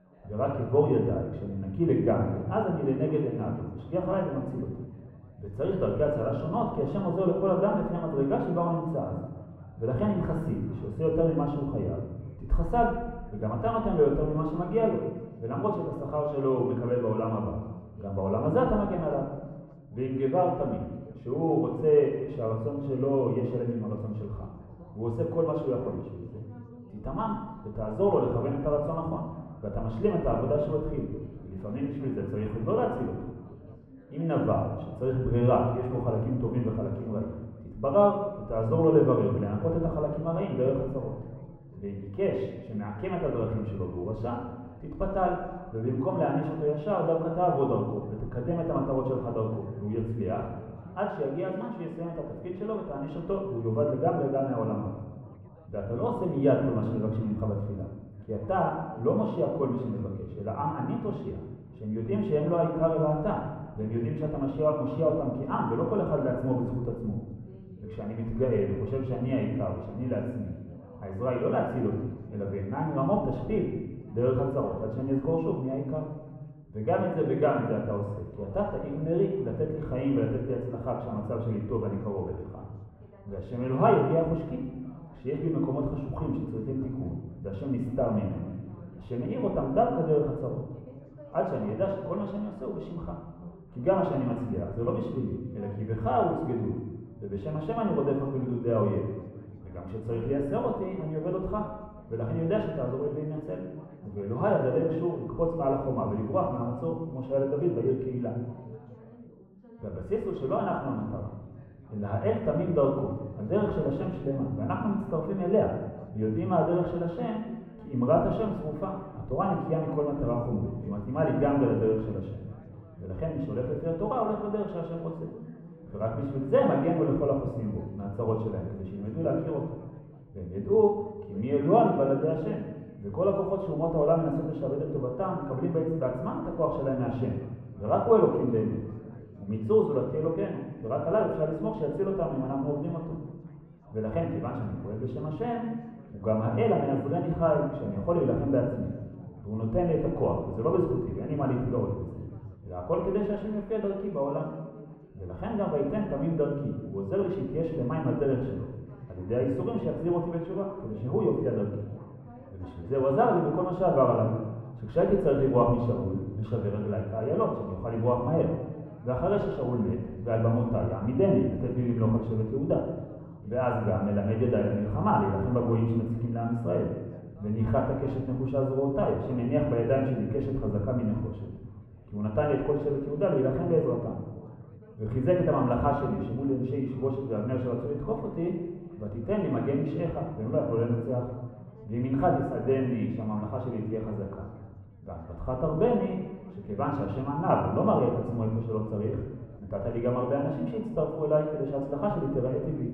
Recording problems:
muffled; very; fading above 2 kHz
room echo; noticeable; dies away in 1.2 s
off-mic speech; somewhat distant
background chatter; faint; throughout; 4 voices, 25 dB below the speech

